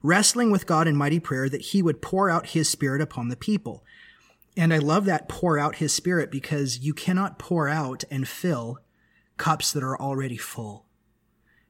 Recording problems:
none

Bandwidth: 16.5 kHz